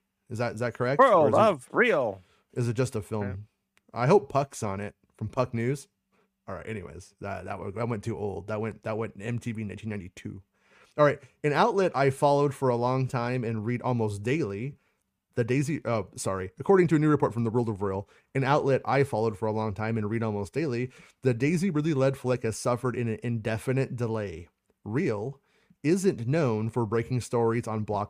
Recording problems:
none

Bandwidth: 15 kHz